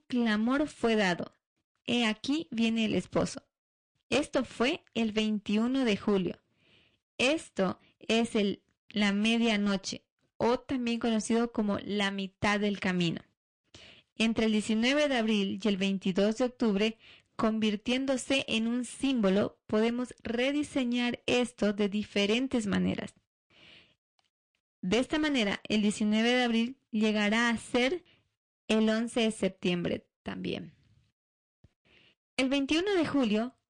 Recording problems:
distortion; slight; 8% of the sound clipped
garbled, watery; slightly; nothing above 9 kHz

